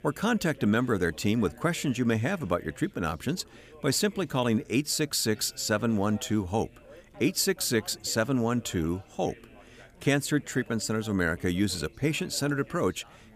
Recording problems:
background chatter; faint; throughout; 4 voices, 25 dB below the speech

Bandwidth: 15 kHz